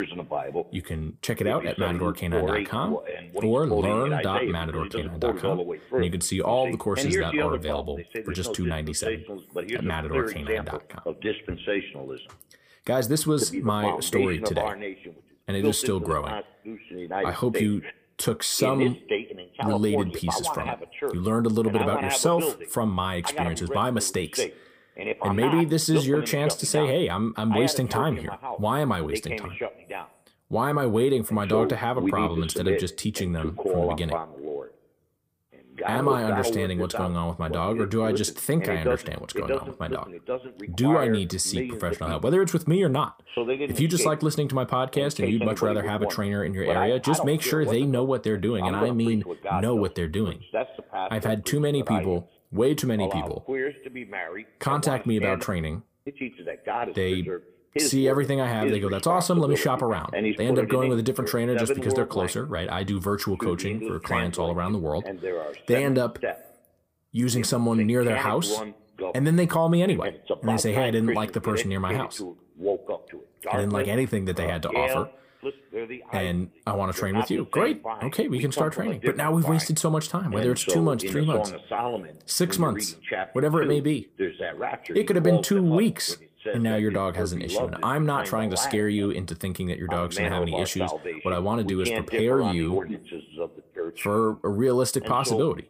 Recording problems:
voice in the background; loud; throughout; 5 dB below the speech

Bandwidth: 15 kHz